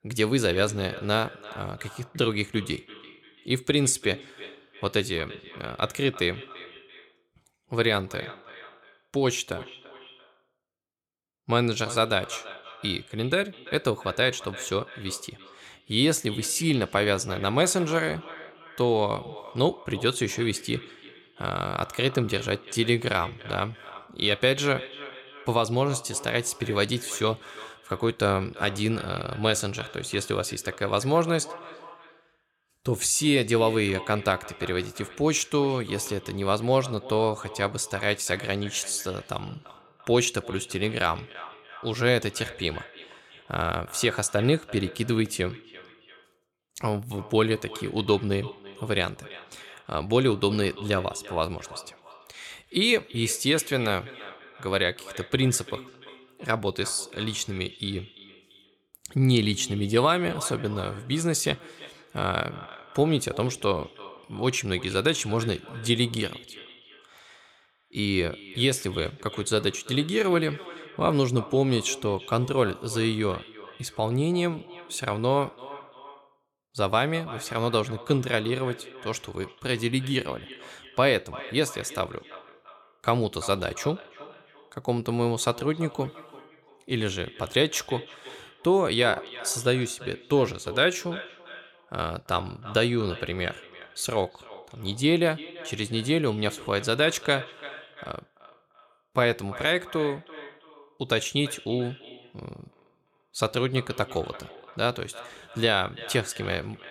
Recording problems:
echo of what is said; noticeable; throughout; 340 ms later, 15 dB below the speech

